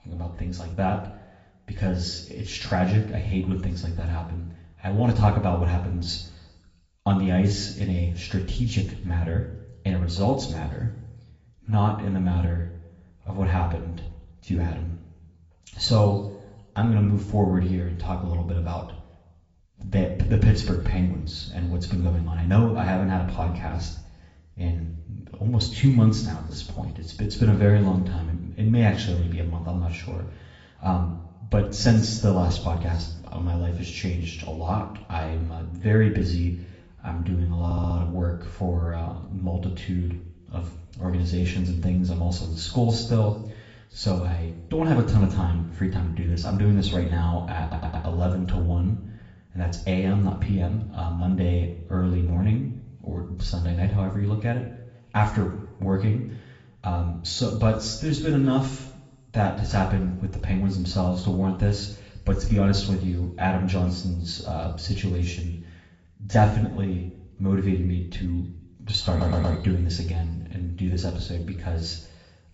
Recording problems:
high frequencies cut off; noticeable; nothing above 7.5 kHz
room echo; slight; dies away in 0.7 s
off-mic speech; somewhat distant
garbled, watery; slightly
audio stuttering; at 38 s, at 48 s and at 1:09

